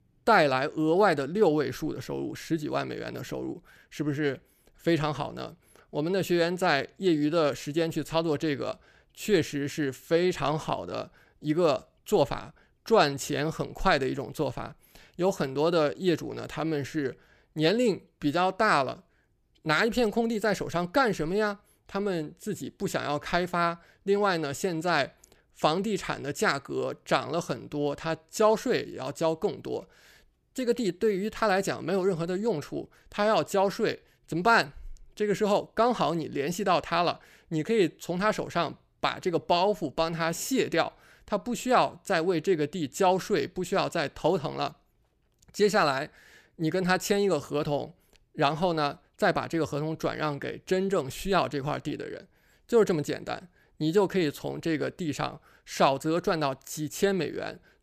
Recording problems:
none

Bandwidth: 14.5 kHz